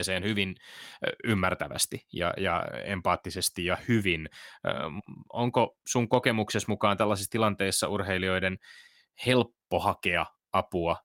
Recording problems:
abrupt cut into speech; at the start

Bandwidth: 16.5 kHz